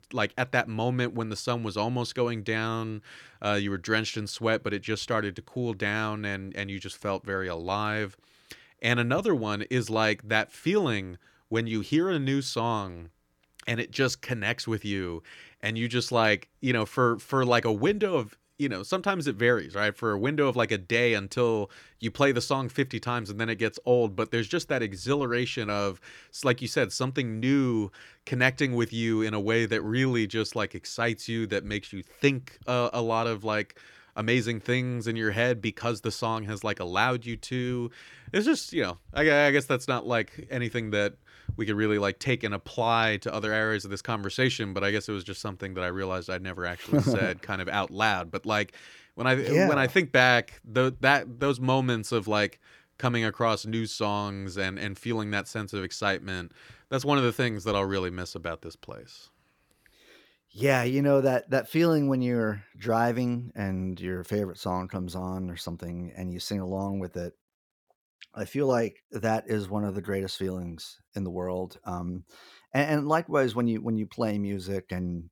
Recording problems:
none

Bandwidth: 18.5 kHz